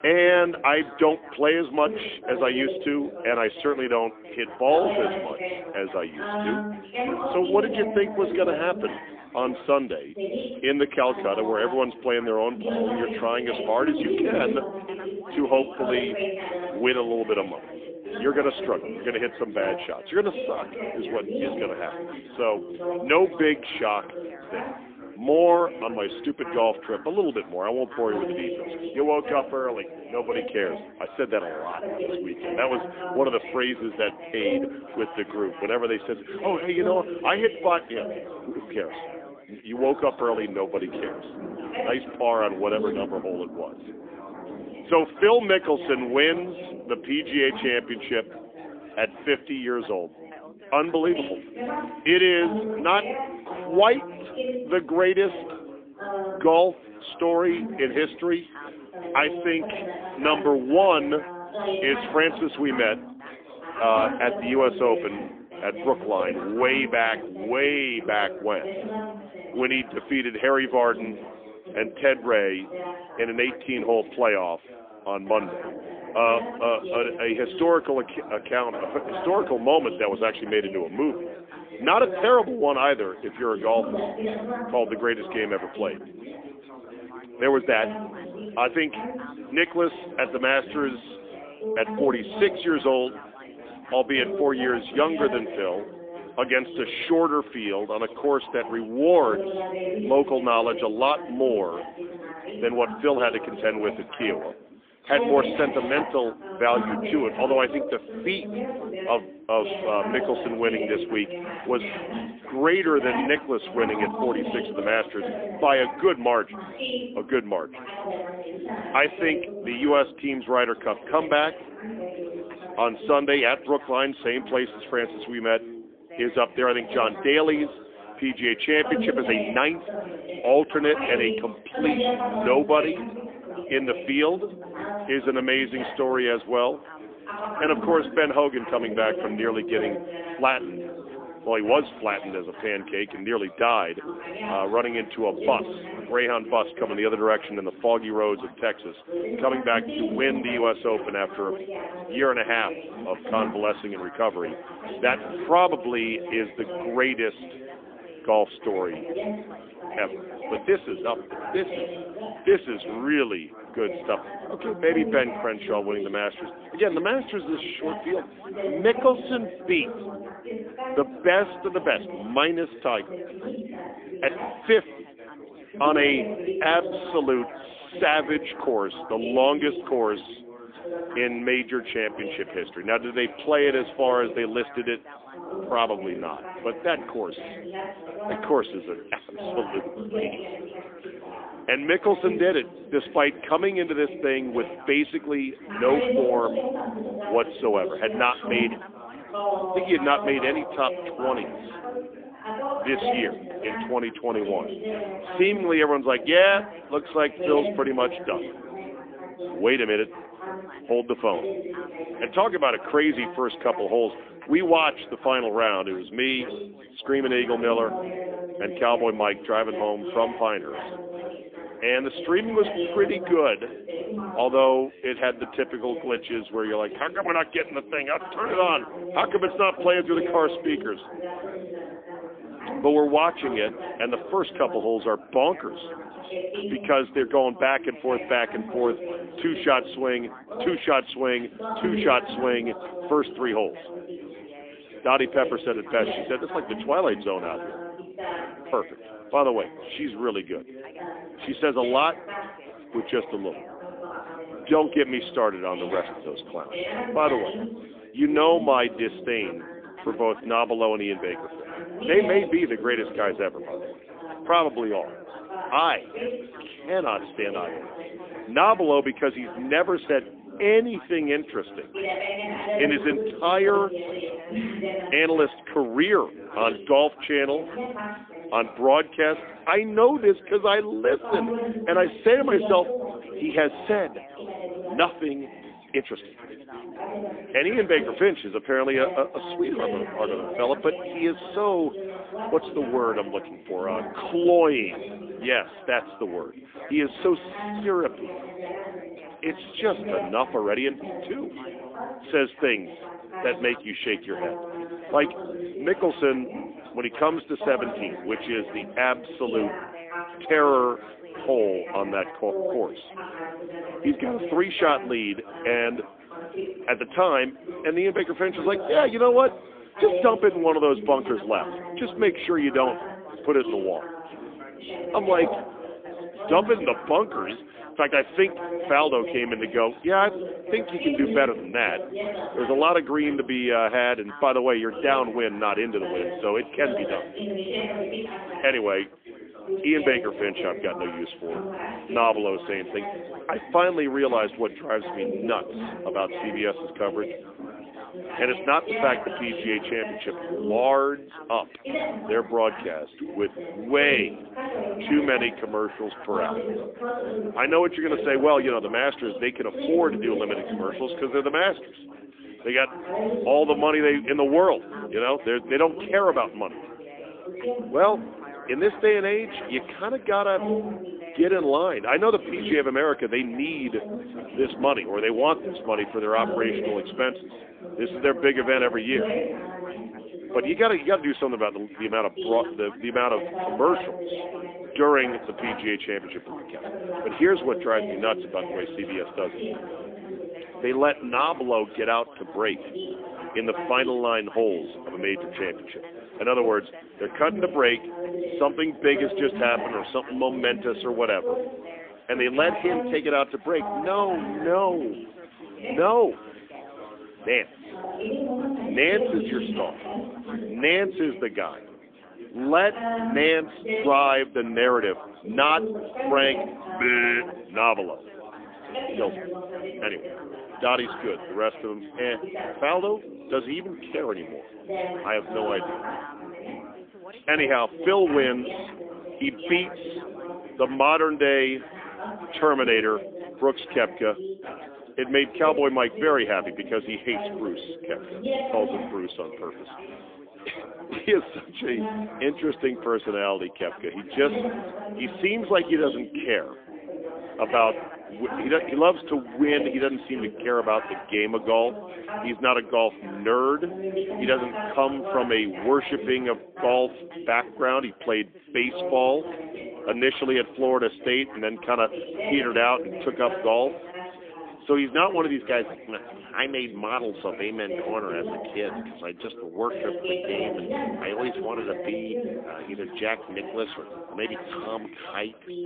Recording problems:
phone-call audio; poor line; nothing above 3.5 kHz
background chatter; loud; throughout; 4 voices, 10 dB below the speech
rain or running water; faint; throughout; 30 dB below the speech

